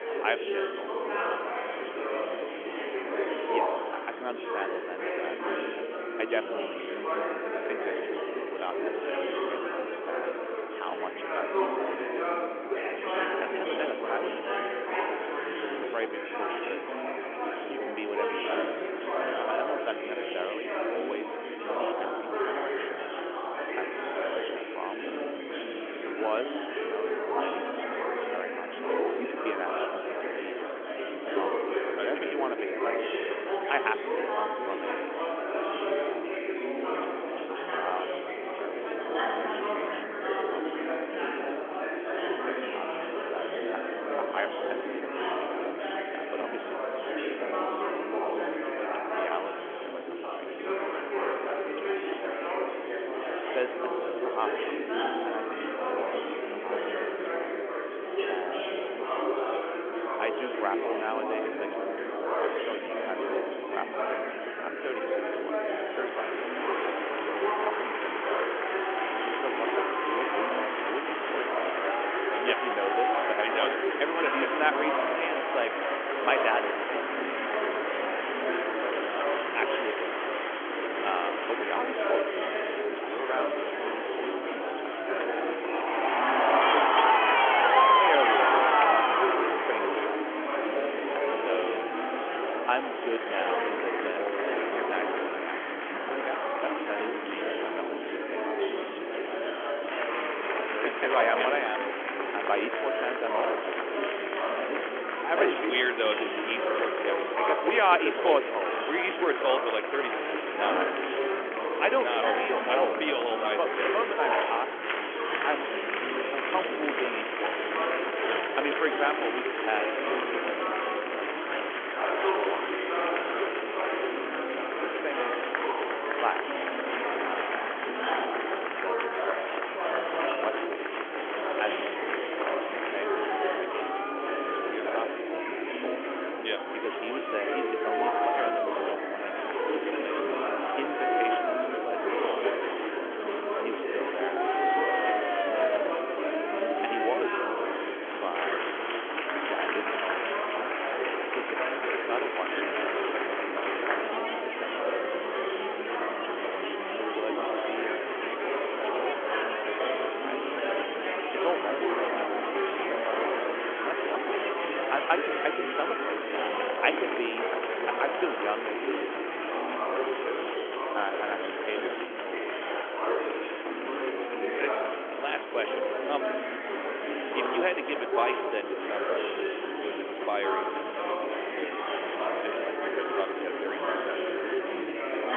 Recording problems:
phone-call audio; nothing above 3.5 kHz
murmuring crowd; very loud; throughout; 5 dB above the speech

